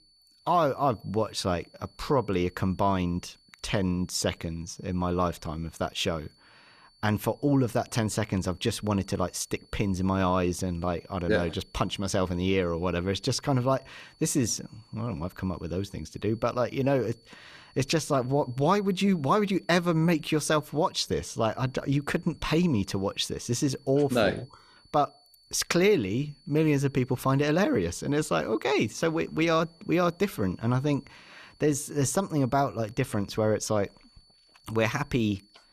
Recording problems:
high-pitched whine; faint; throughout; 4.5 kHz, 30 dB below the speech

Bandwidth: 14.5 kHz